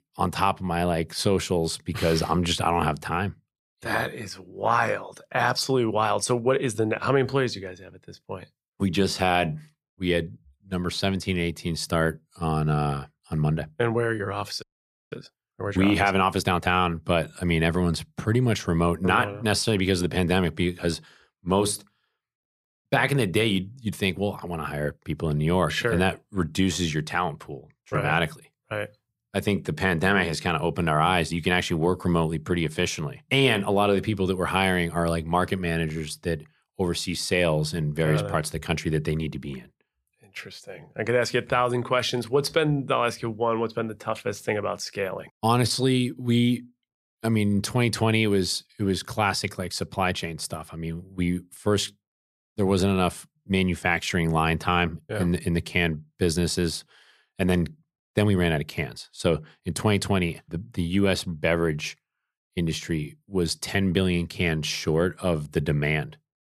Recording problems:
audio freezing; at 15 s

